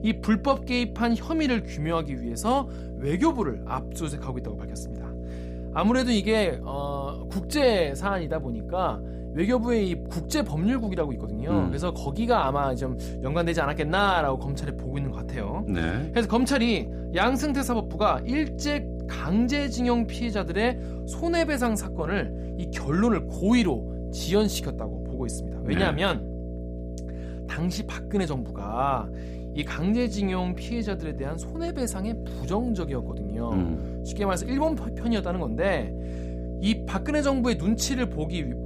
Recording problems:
electrical hum; noticeable; throughout; 60 Hz, 15 dB below the speech

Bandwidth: 15 kHz